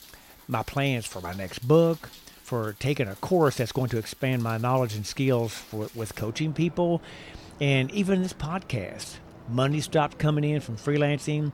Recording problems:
rain or running water; faint; throughout; 20 dB below the speech

